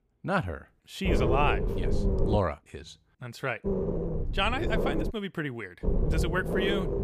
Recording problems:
low rumble; loud; from 1 to 2.5 s, from 3.5 to 5 s and from 6 s on; 4 dB below the speech

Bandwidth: 15 kHz